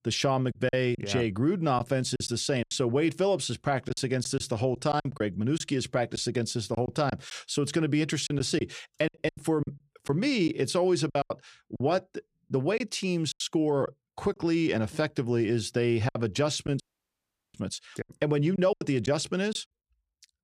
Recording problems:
choppy; very; 8% of the speech affected
audio cutting out; at 17 s for 0.5 s

